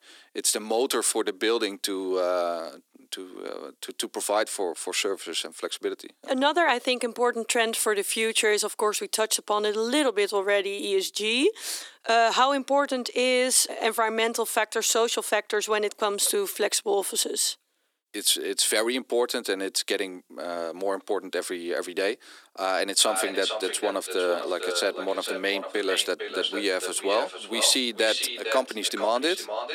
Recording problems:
echo of what is said; strong; from 23 s on; 450 ms later, 7 dB below the speech
thin; somewhat; fading below 300 Hz

